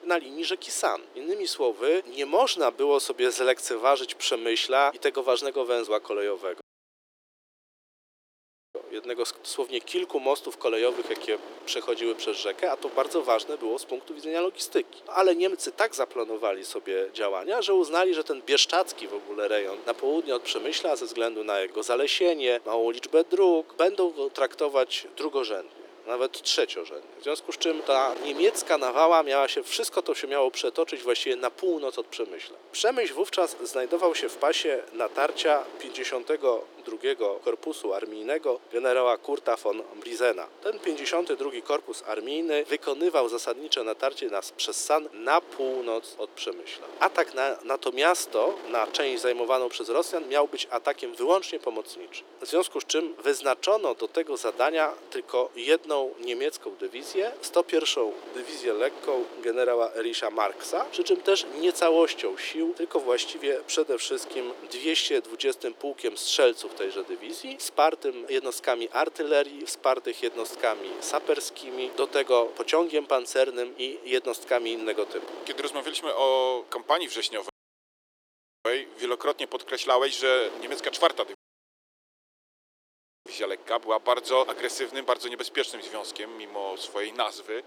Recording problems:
thin; very; fading below 350 Hz
wind noise on the microphone; occasional gusts; 20 dB below the speech
audio cutting out; at 6.5 s for 2 s, at 1:17 for 1 s and at 1:21 for 2 s

